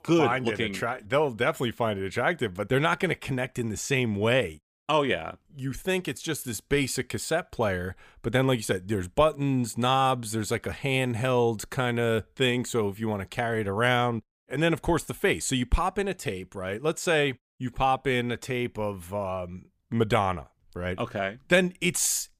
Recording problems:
none

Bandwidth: 15 kHz